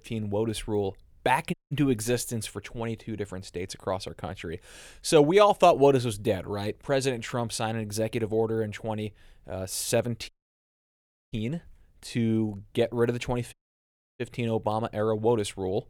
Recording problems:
audio cutting out; at 1.5 s, at 10 s for 1 s and at 14 s for 0.5 s

